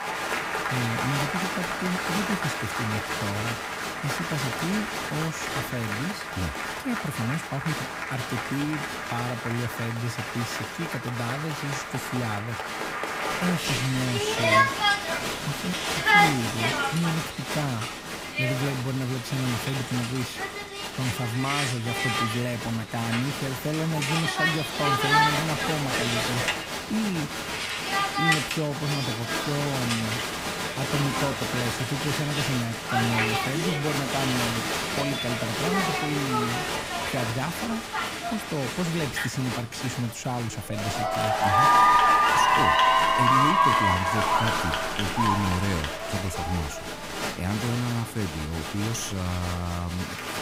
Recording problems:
crowd noise; very loud; throughout; 4 dB above the speech
rain or running water; very faint; until 26 s; 30 dB below the speech

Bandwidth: 15.5 kHz